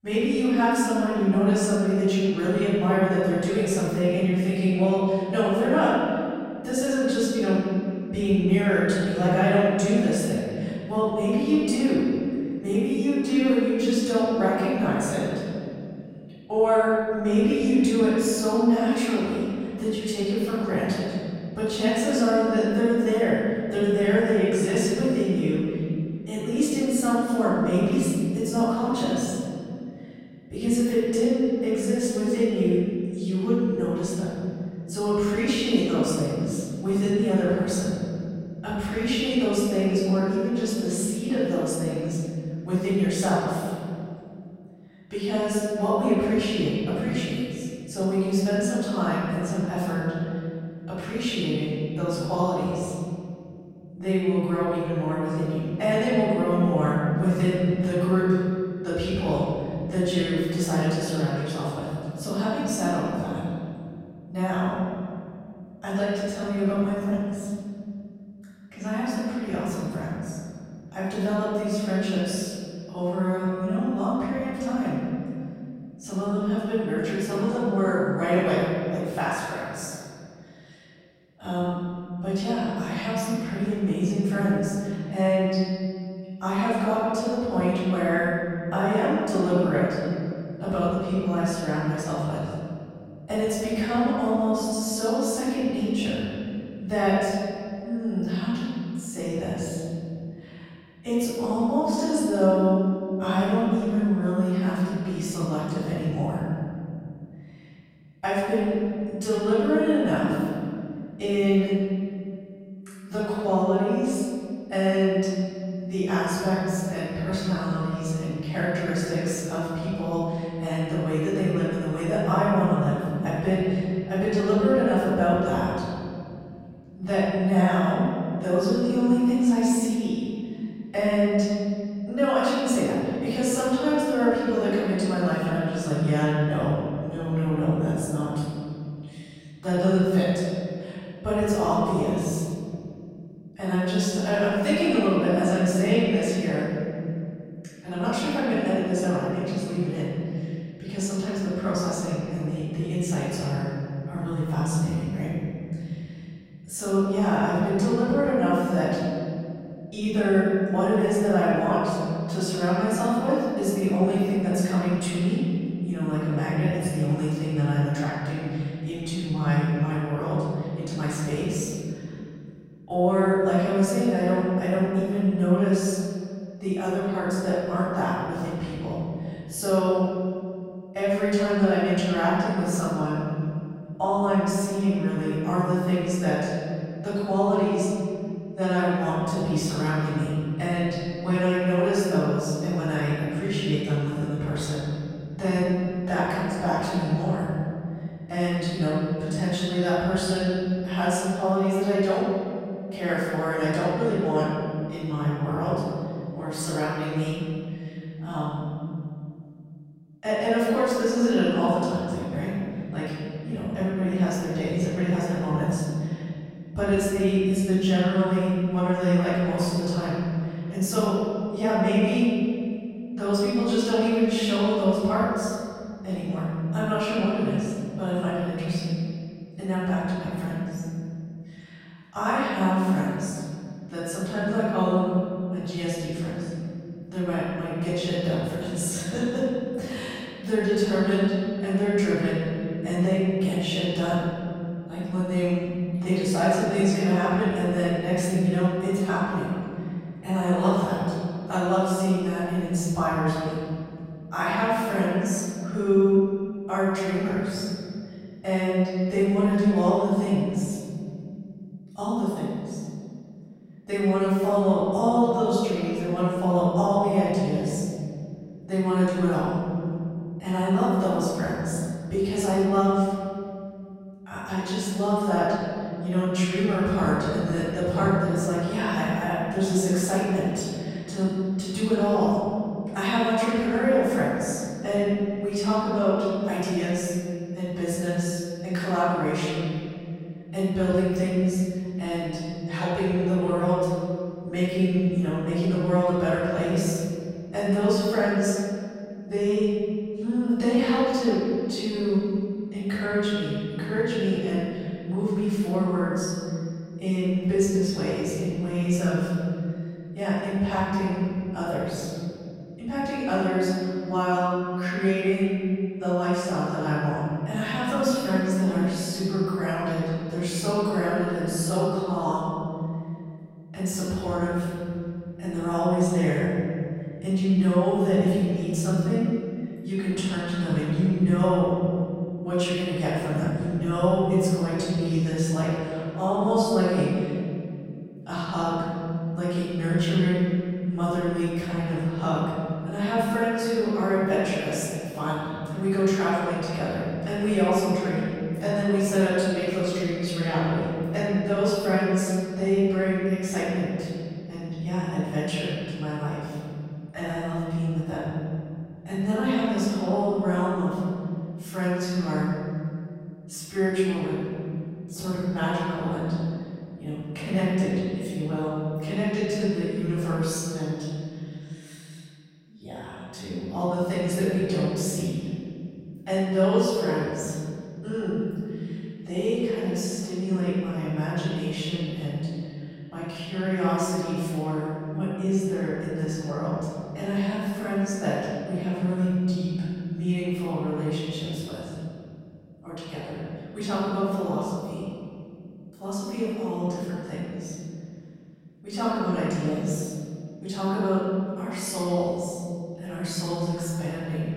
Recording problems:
room echo; strong; dies away in 2.7 s
off-mic speech; far

